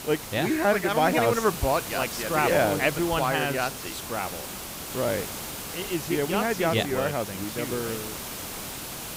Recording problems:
hiss; loud; throughout; 8 dB below the speech

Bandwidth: 15.5 kHz